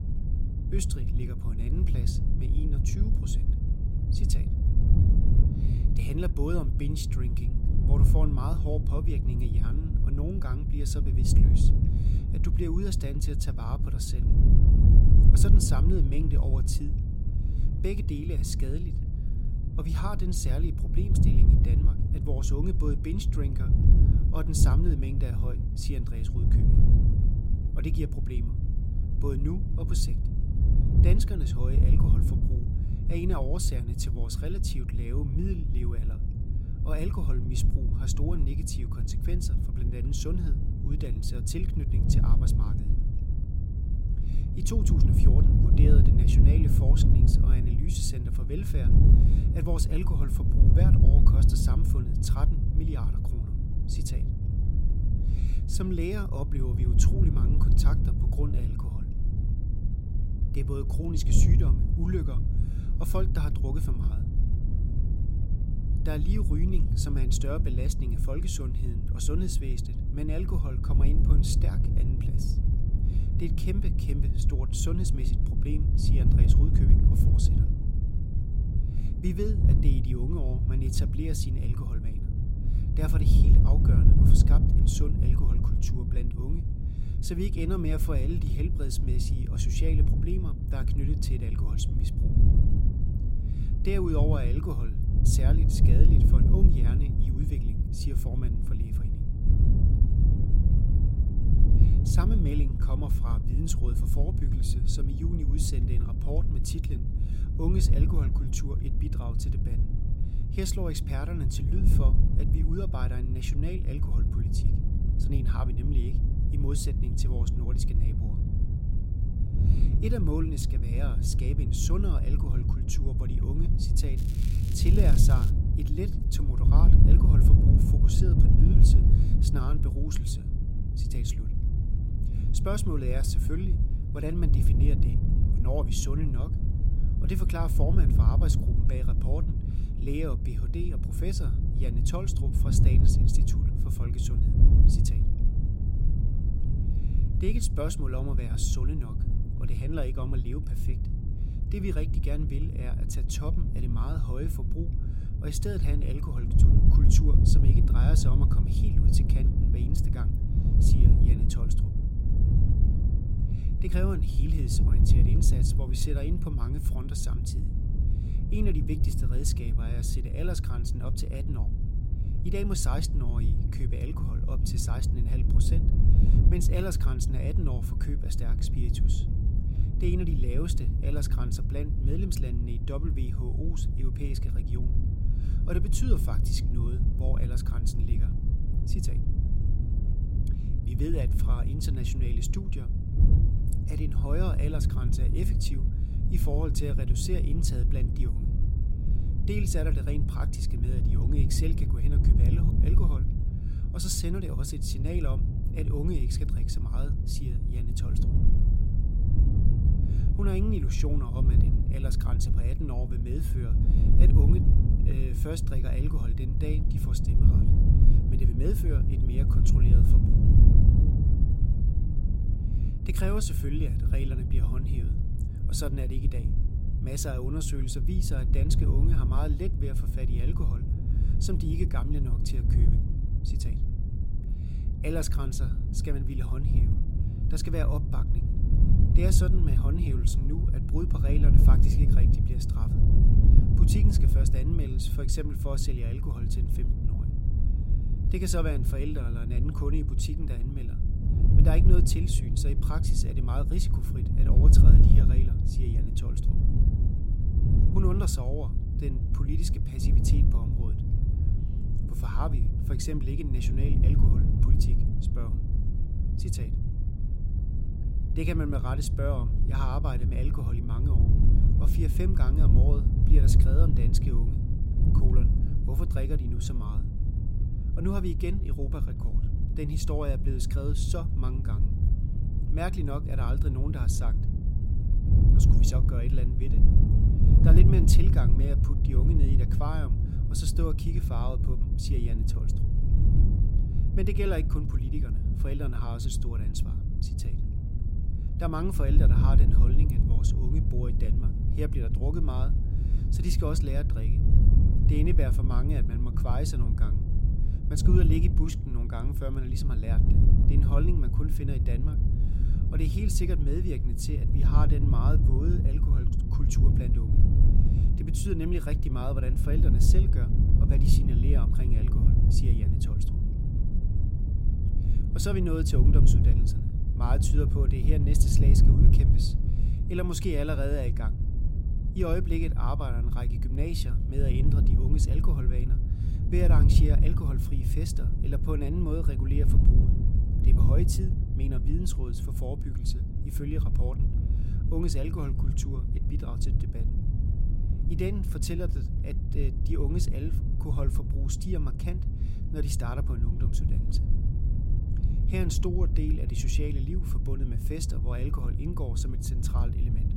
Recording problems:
wind noise on the microphone; heavy; 2 dB below the speech
crackling; noticeable; from 2:04 to 2:06; 15 dB below the speech

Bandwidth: 16 kHz